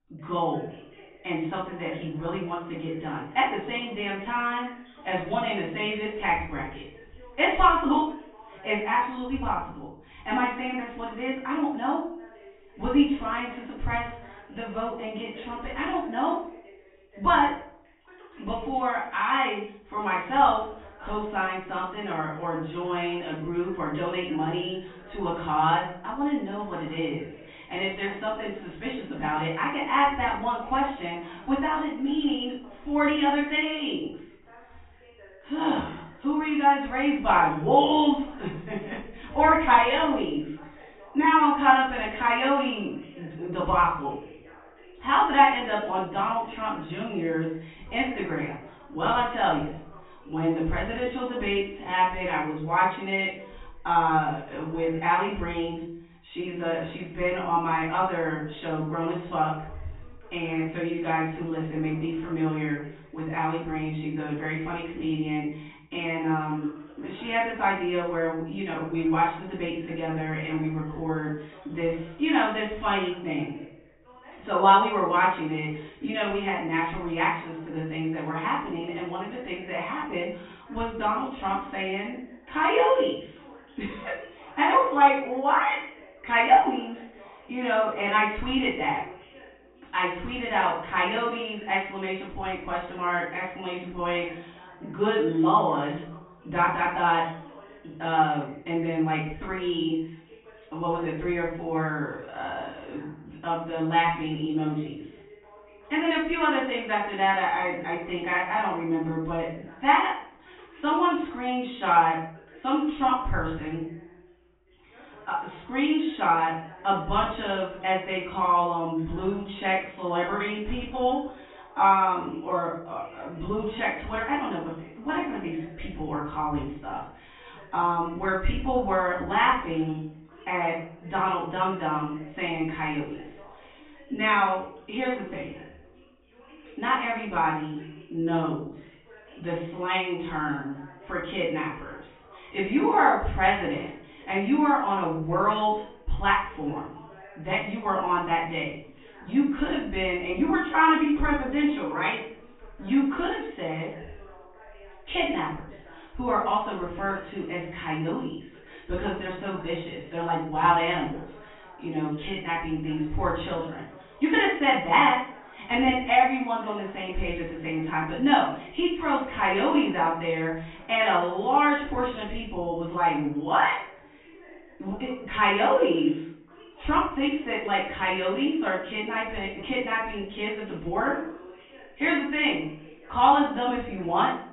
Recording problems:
off-mic speech; far
high frequencies cut off; severe; nothing above 4 kHz
room echo; noticeable; dies away in 0.5 s
voice in the background; faint; throughout; 25 dB below the speech

